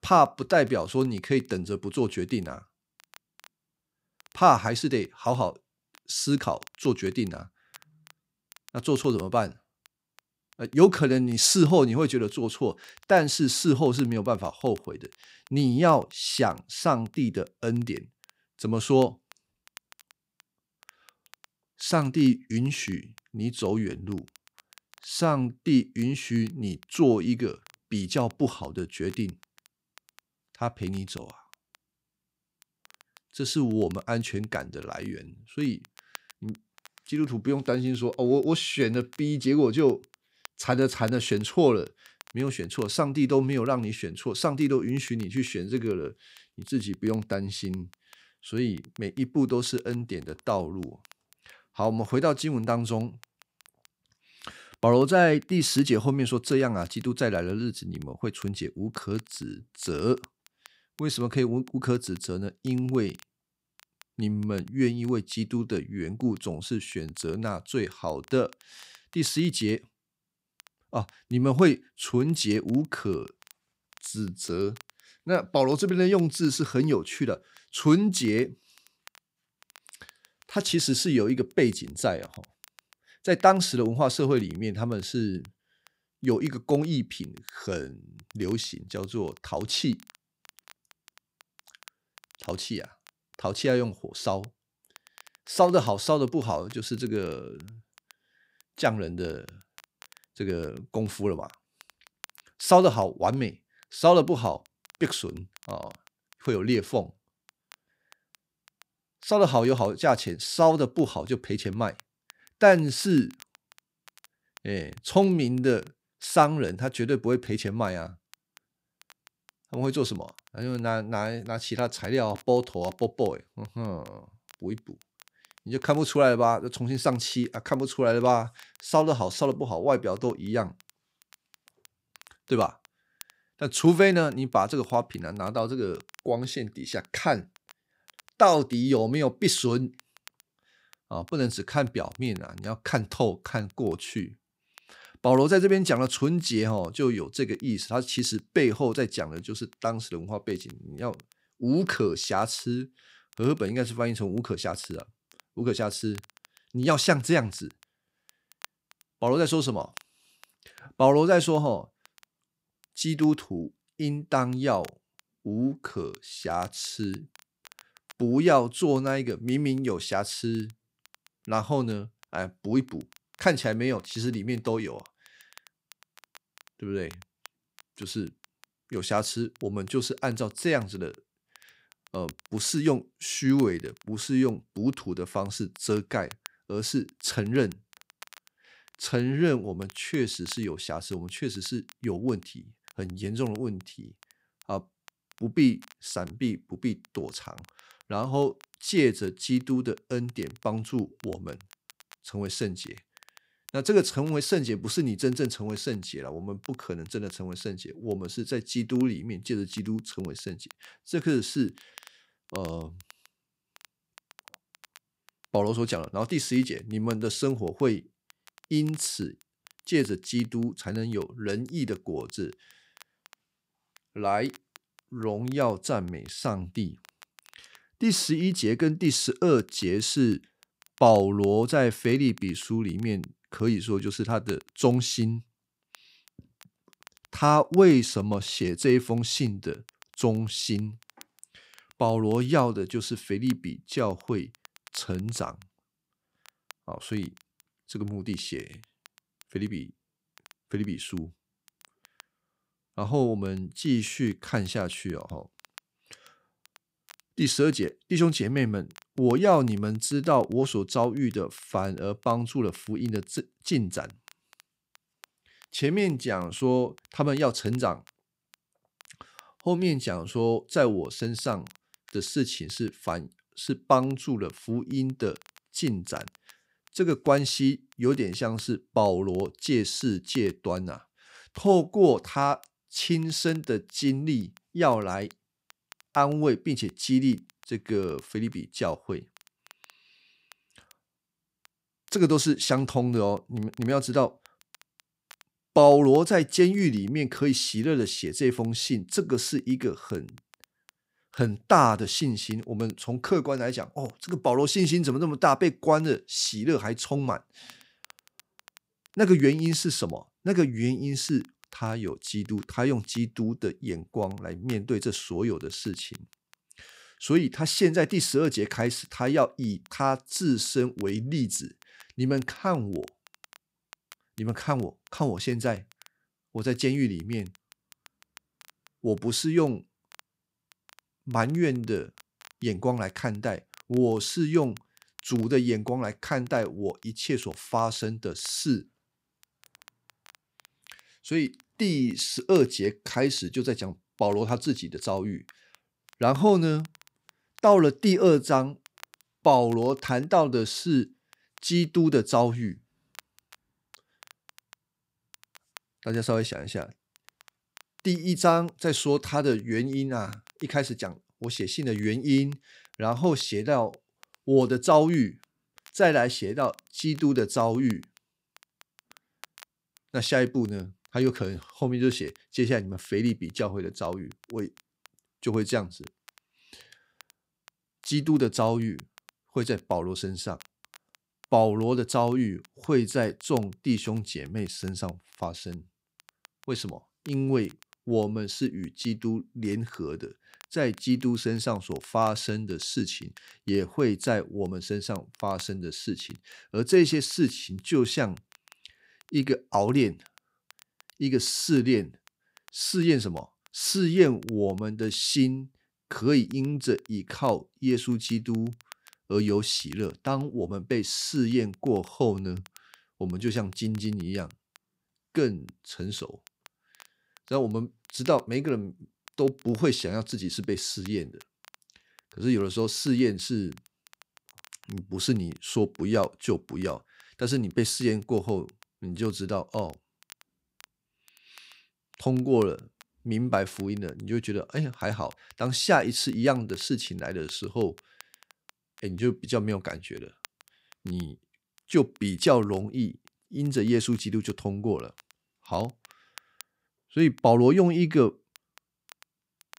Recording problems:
crackle, like an old record; faint; 30 dB below the speech

